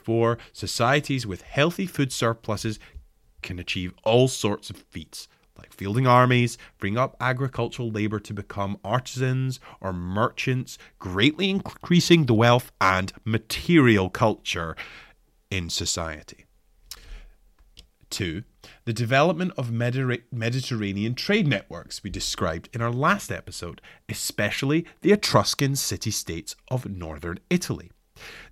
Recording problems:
none

